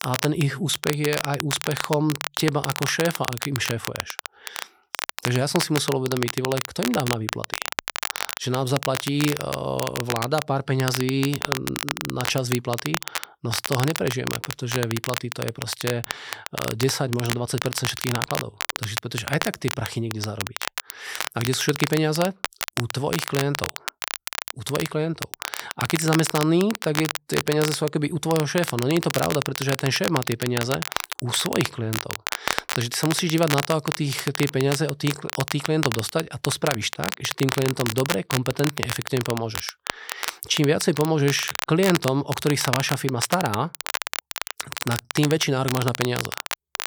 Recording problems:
crackle, like an old record; loud; 5 dB below the speech

